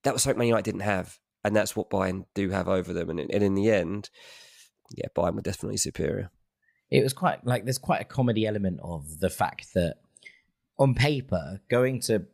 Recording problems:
none

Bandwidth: 15.5 kHz